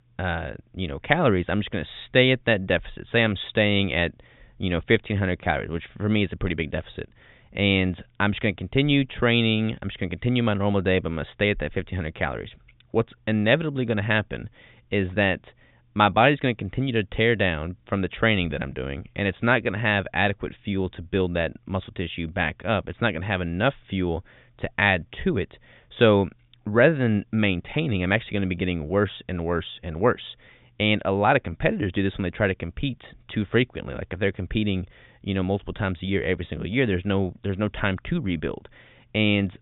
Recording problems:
high frequencies cut off; severe; nothing above 3.5 kHz

